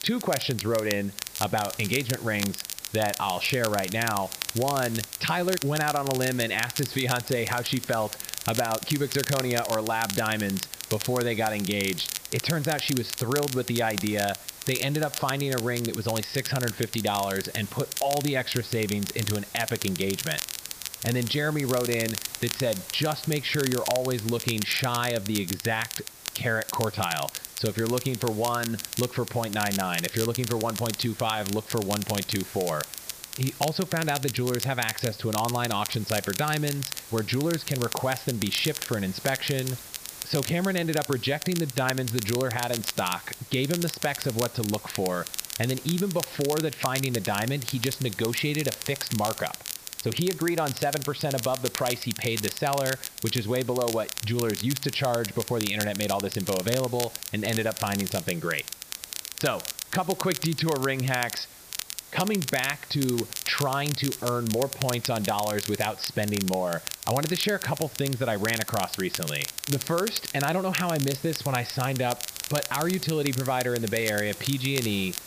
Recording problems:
high frequencies cut off; noticeable; nothing above 5.5 kHz
crackle, like an old record; loud; 6 dB below the speech
hiss; noticeable; throughout; 15 dB below the speech

